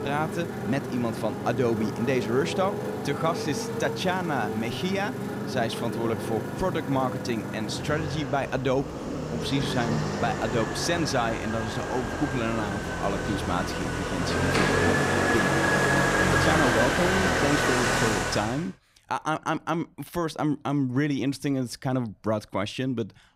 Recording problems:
traffic noise; very loud; until 18 s; 1 dB above the speech

